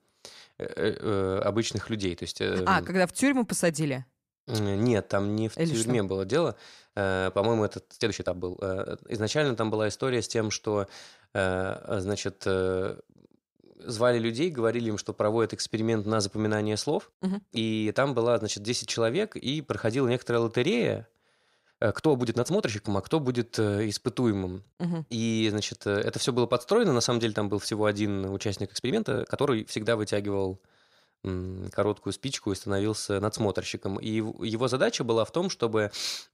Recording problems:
uneven, jittery; strongly; from 8 to 30 s

